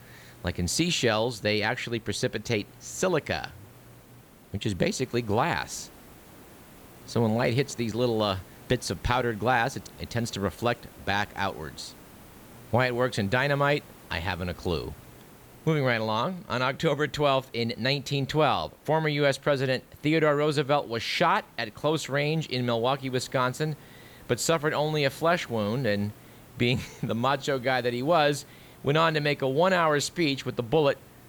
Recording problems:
hiss; faint; throughout; 25 dB below the speech

